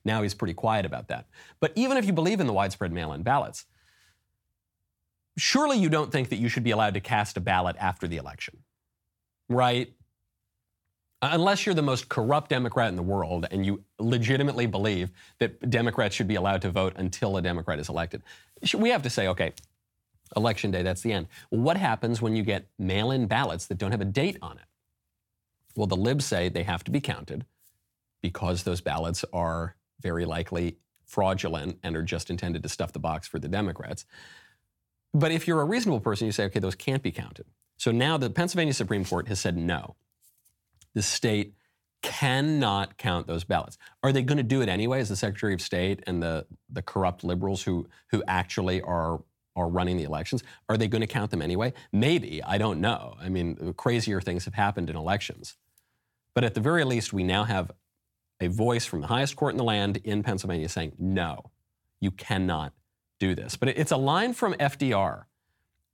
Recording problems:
none

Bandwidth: 17.5 kHz